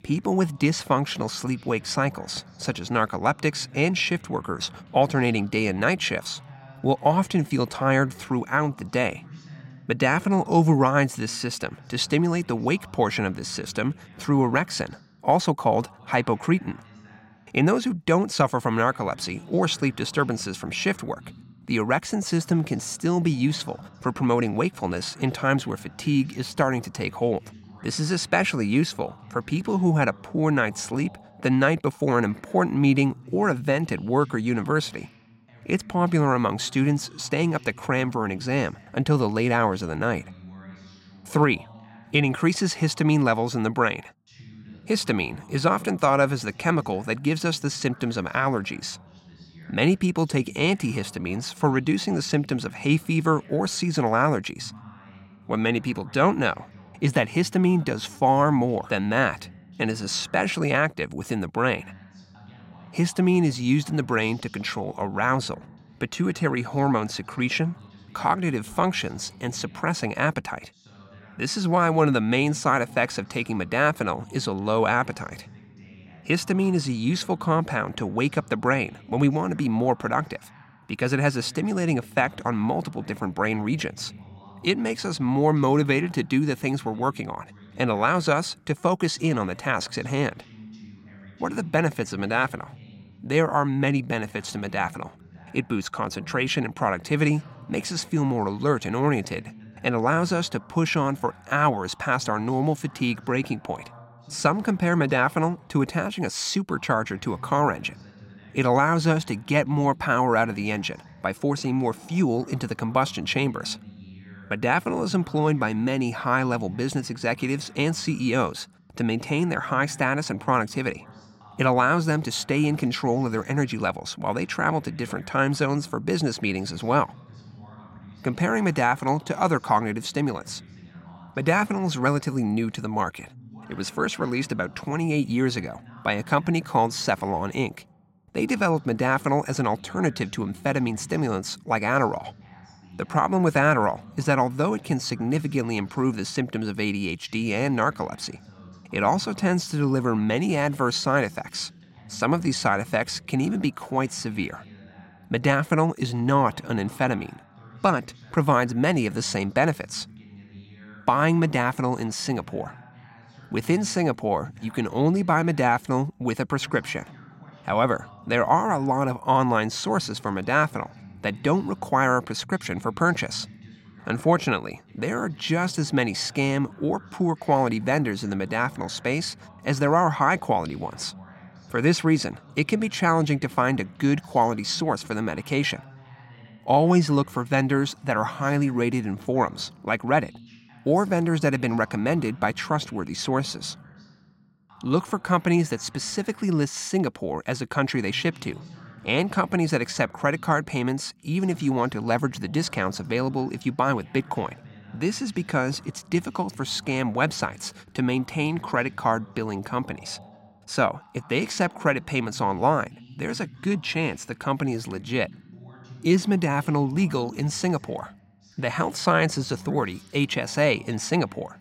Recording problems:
voice in the background; faint; throughout; 20 dB below the speech

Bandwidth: 16 kHz